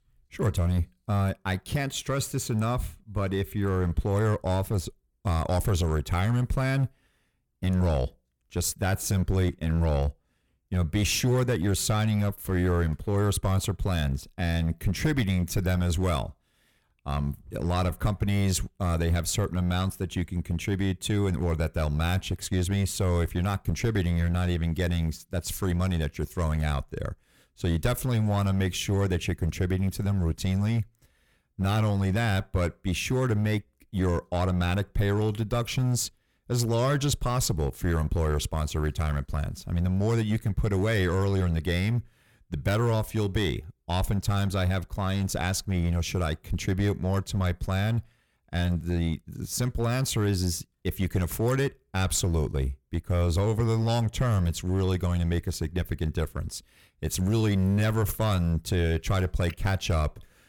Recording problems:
distortion; slight; 6% of the sound clipped

